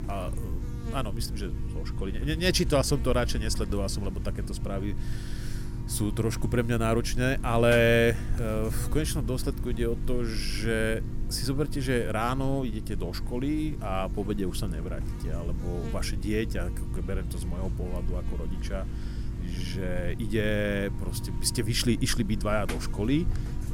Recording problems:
electrical hum; noticeable; throughout; 50 Hz, 15 dB below the speech

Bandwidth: 16.5 kHz